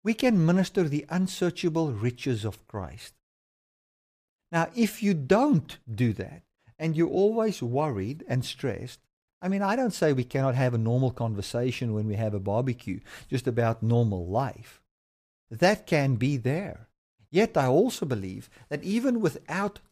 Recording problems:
none

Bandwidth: 14.5 kHz